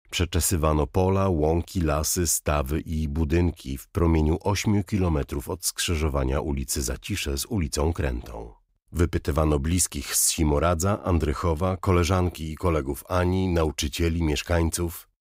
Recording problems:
none

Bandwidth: 15.5 kHz